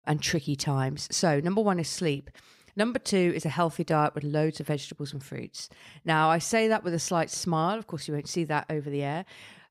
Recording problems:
none

